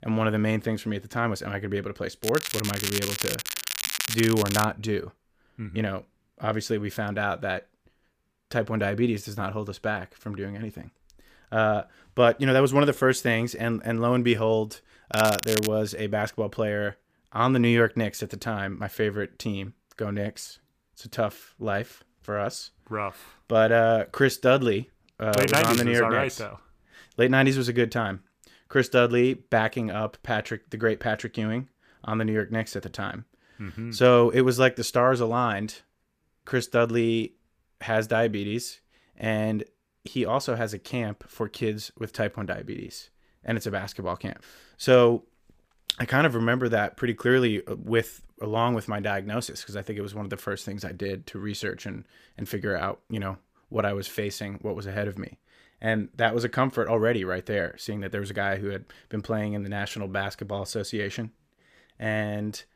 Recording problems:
crackling; loud; from 2 to 4.5 s, at 15 s and at 25 s; 3 dB below the speech

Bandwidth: 15 kHz